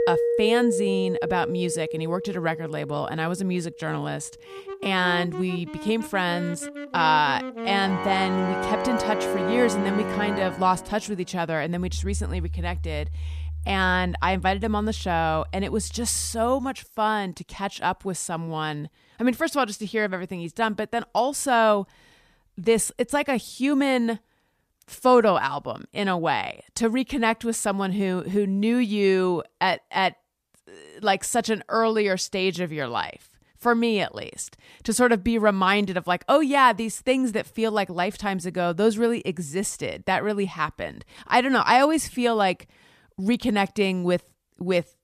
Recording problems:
background music; loud; until 17 s; 6 dB below the speech

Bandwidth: 14.5 kHz